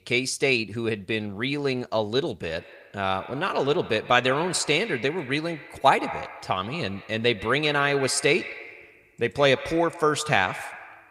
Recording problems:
echo of what is said; noticeable; from 2.5 s on; 130 ms later, 15 dB below the speech

